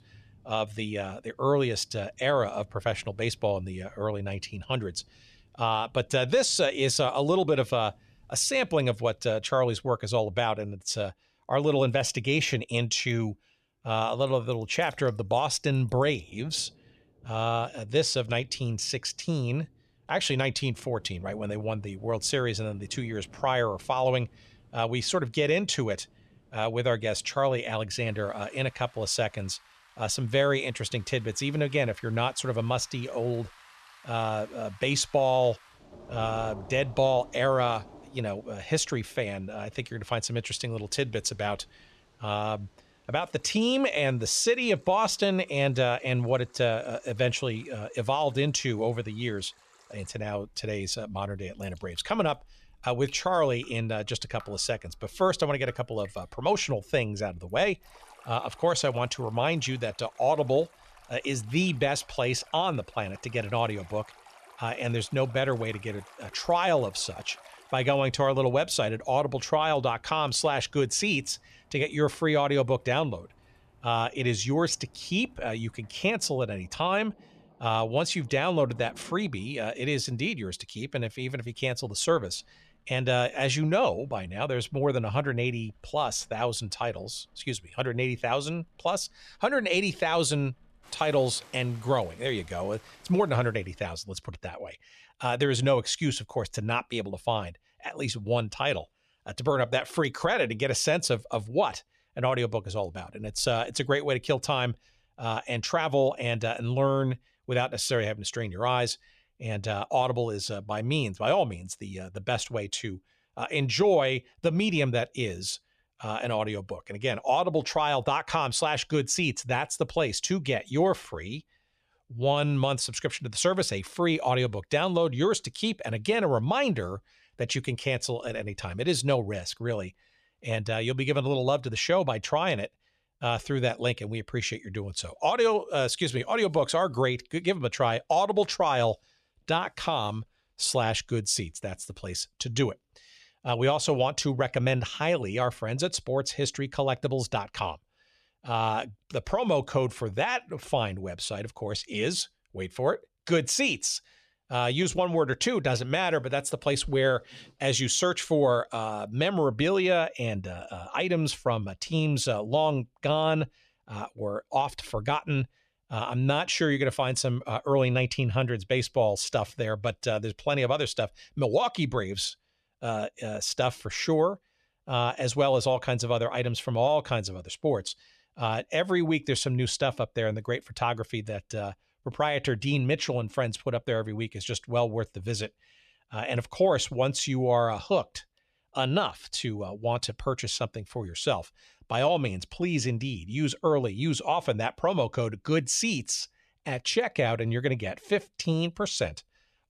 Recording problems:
rain or running water; faint; until 1:34; 25 dB below the speech

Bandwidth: 13.5 kHz